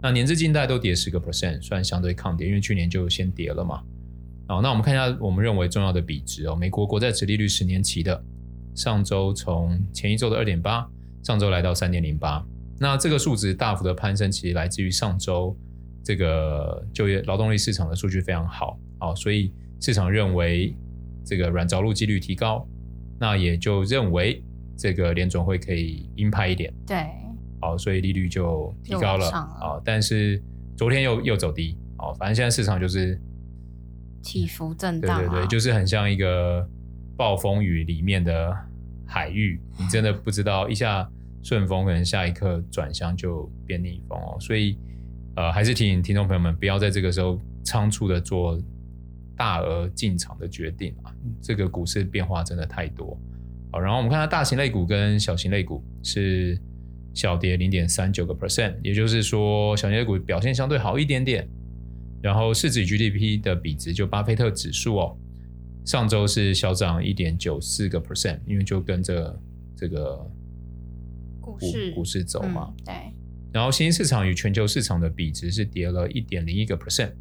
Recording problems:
electrical hum; faint; throughout; 60 Hz, 25 dB below the speech

